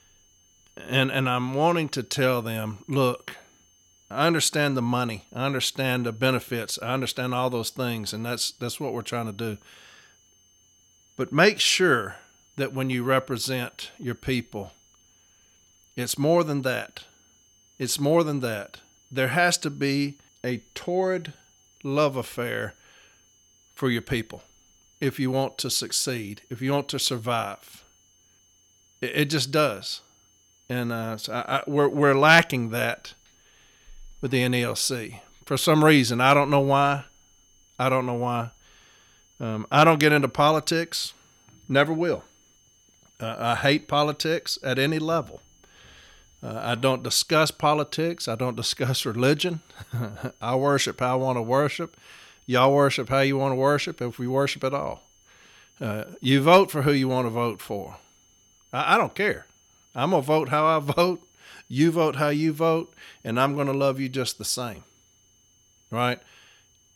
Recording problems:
high-pitched whine; faint; throughout; 6.5 kHz, 35 dB below the speech

